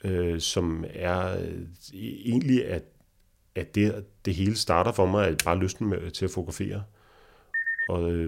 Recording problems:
keyboard typing; very faint; at 5.5 s; peak 3 dB below the speech
phone ringing; loud; at 7.5 s; peak 1 dB above the speech
abrupt cut into speech; at the end

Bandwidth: 16 kHz